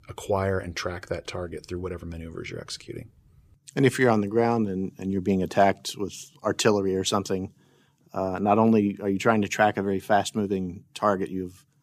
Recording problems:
none

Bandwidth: 15 kHz